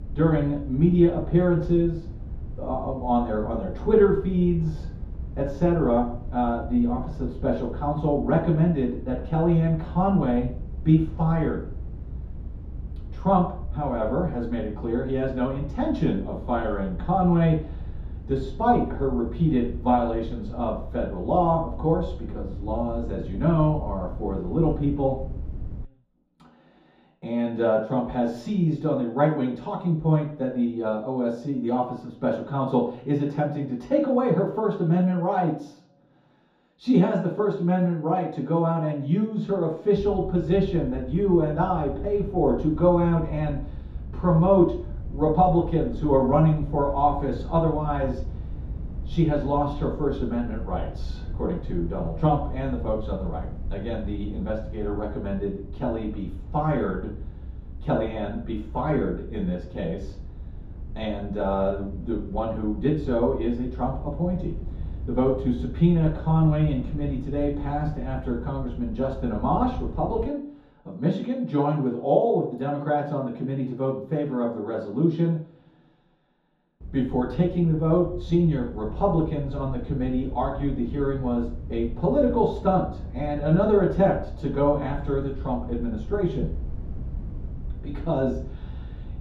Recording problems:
off-mic speech; far
room echo; noticeable; dies away in 0.6 s
low rumble; faint; until 26 s, from 40 s to 1:10 and from 1:17 on; 25 dB below the speech

